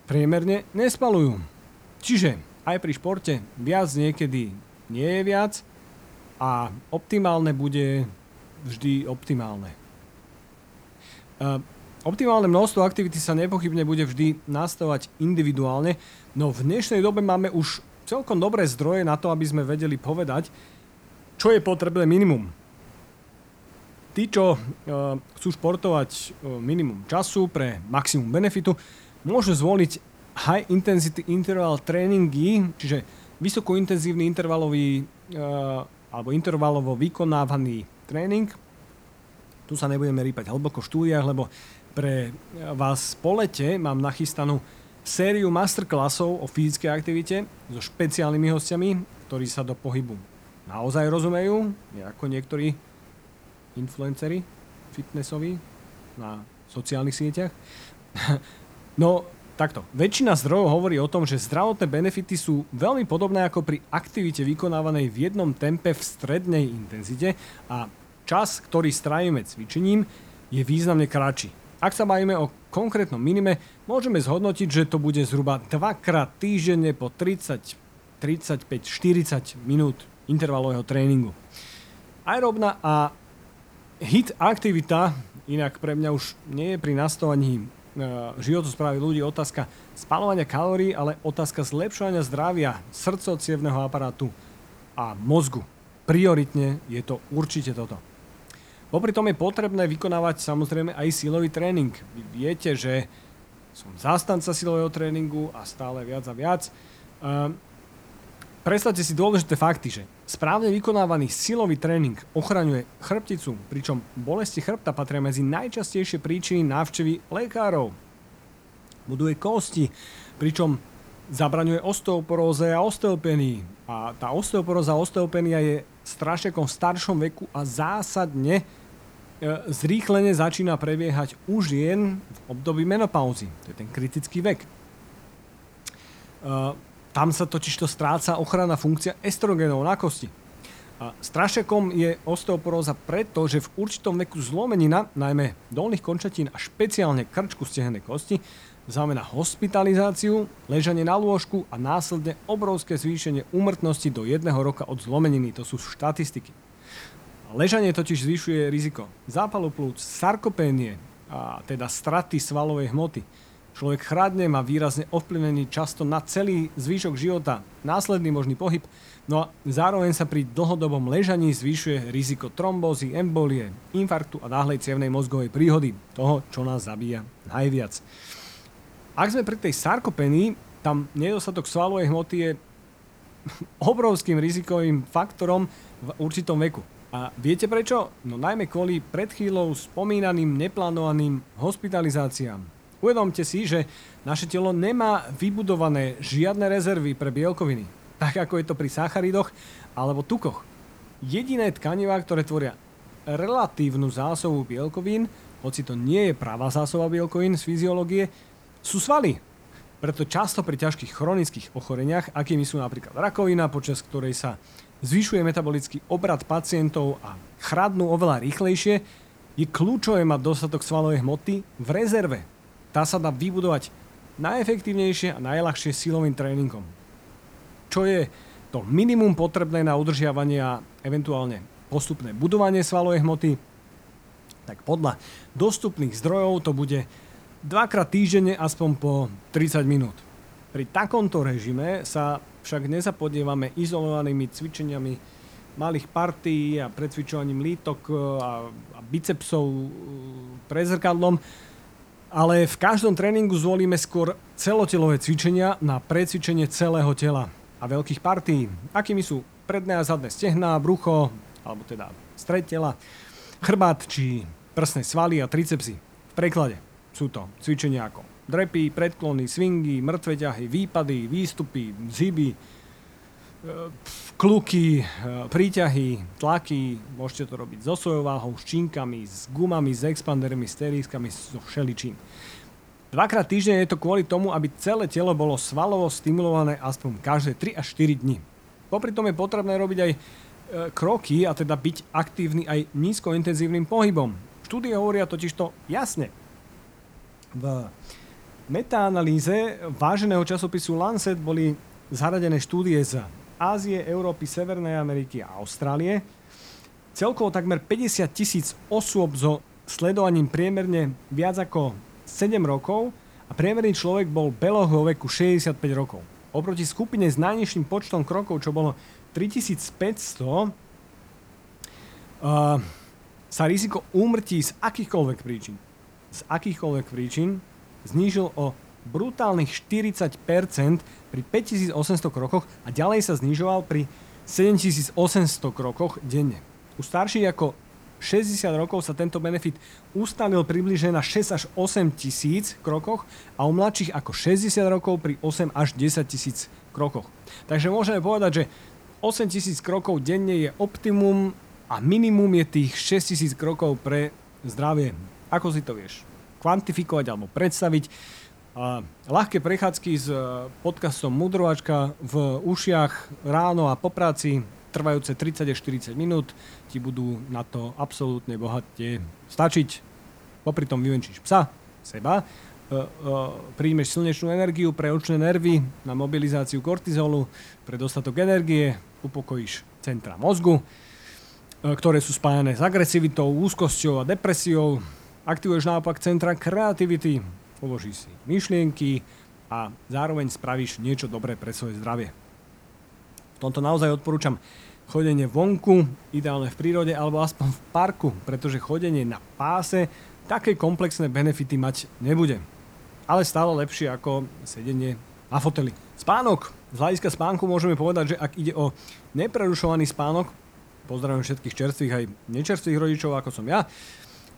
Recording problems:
hiss; faint; throughout; 25 dB below the speech

